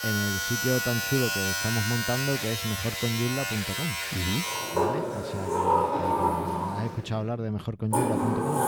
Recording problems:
household noises; very loud; throughout; 3 dB above the speech

